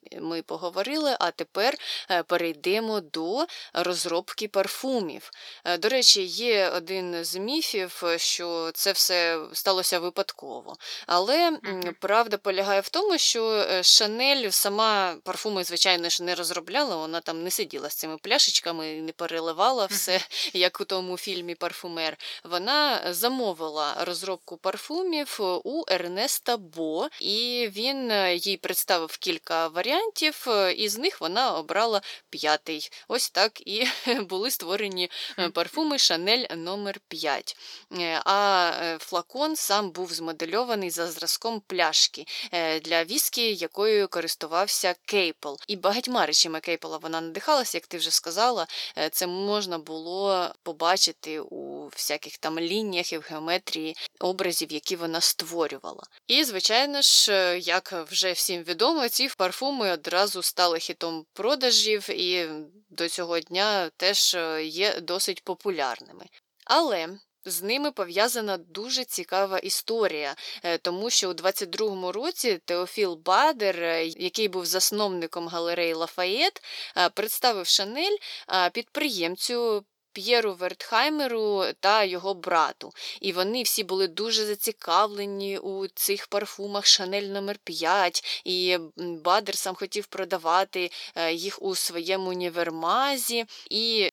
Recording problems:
thin; somewhat; fading below 450 Hz

